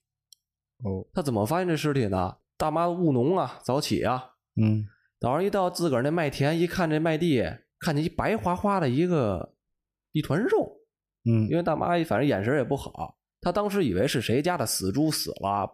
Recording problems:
none

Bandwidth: 14.5 kHz